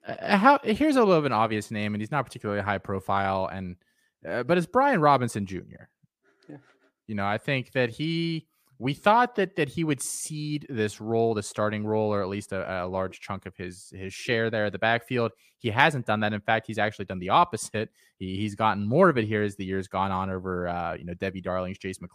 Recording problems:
none

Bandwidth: 15 kHz